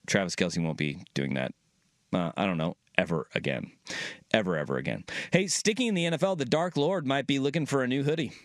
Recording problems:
squashed, flat; heavily

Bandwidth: 13.5 kHz